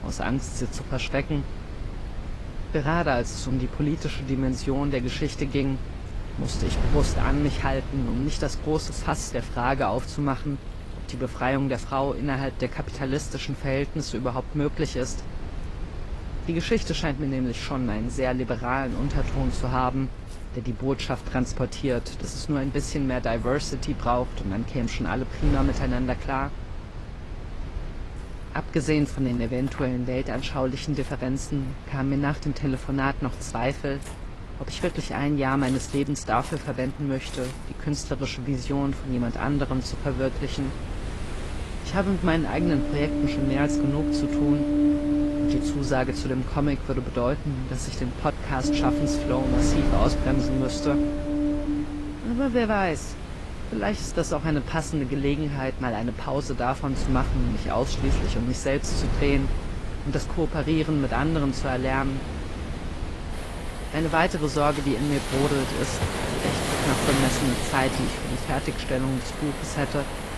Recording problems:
garbled, watery; slightly; nothing above 11.5 kHz
rain or running water; loud; throughout; 3 dB below the speech
wind noise on the microphone; occasional gusts; 15 dB below the speech

